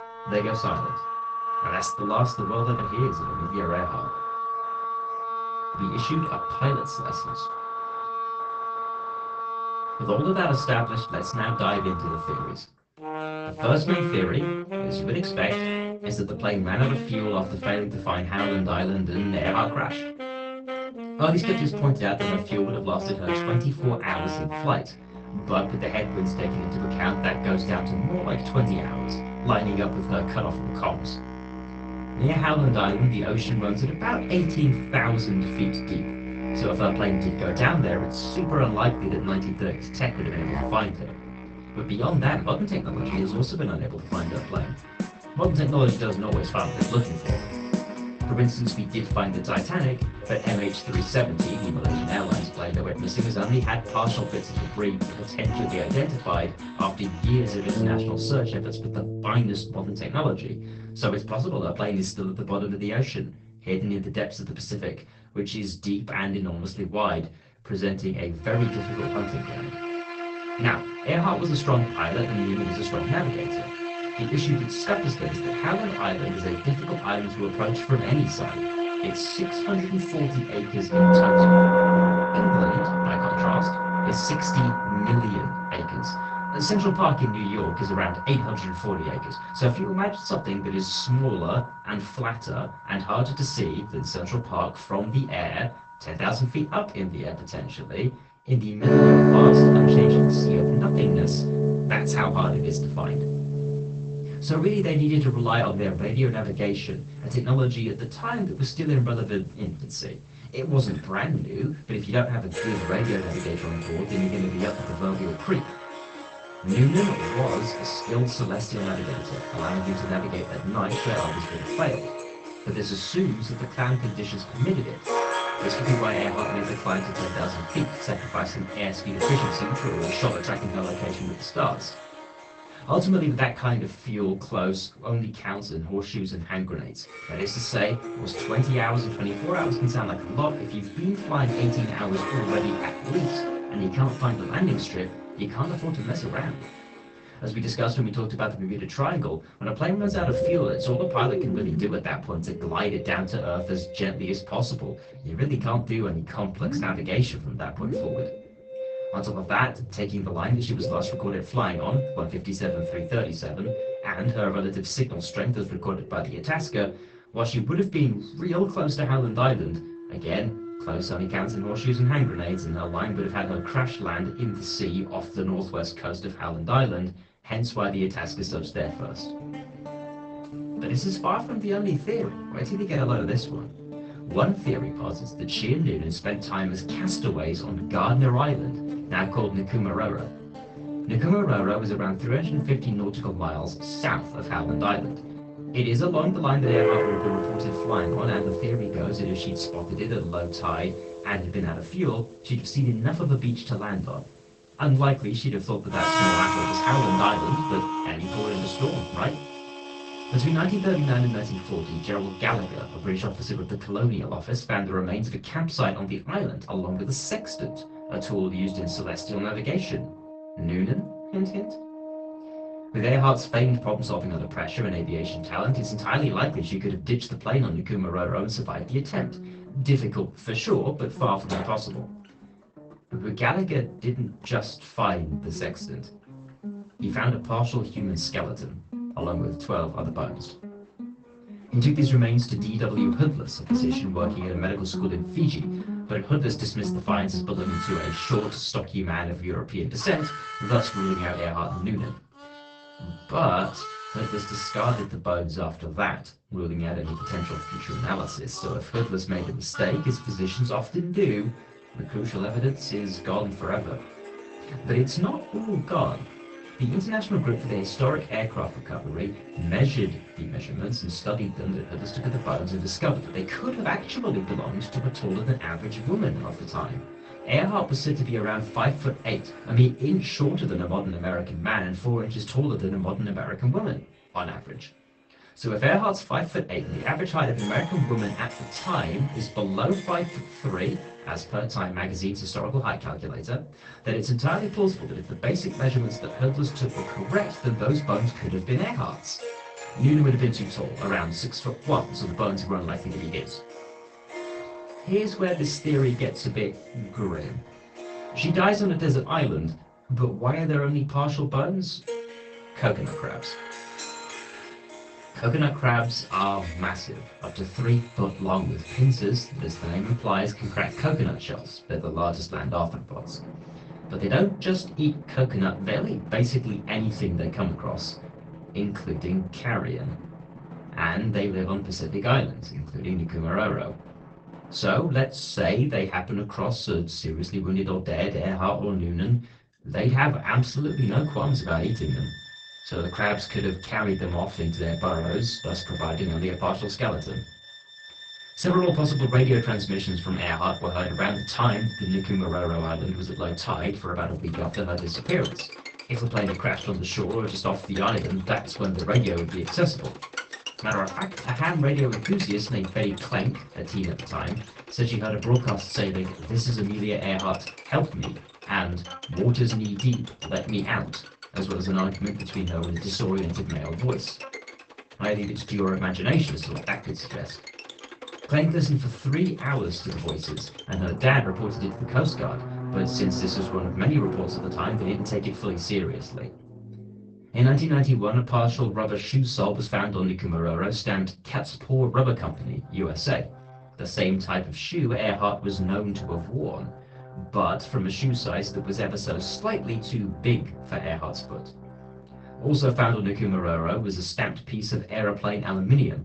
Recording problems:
off-mic speech; far
garbled, watery; badly; nothing above 8 kHz
room echo; very slight; dies away in 0.2 s
background music; loud; throughout; 4 dB below the speech

